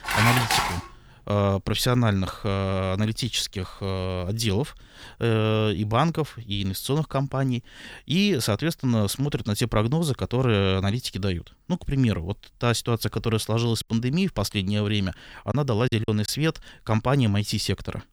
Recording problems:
clattering dishes; loud; at the start; peak 4 dB above the speech
choppy; occasionally; at 16 s; 5% of the speech affected

